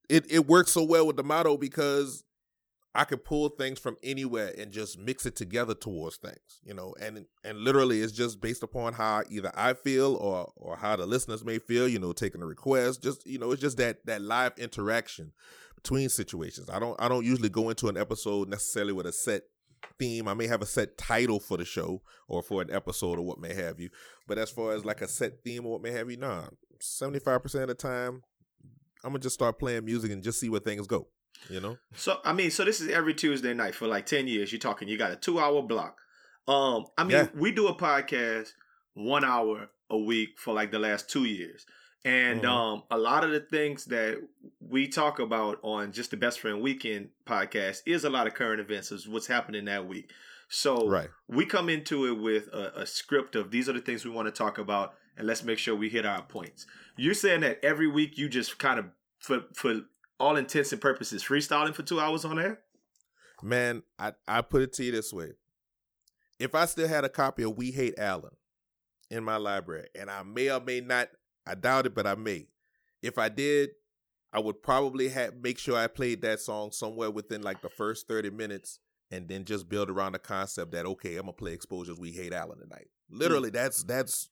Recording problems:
none

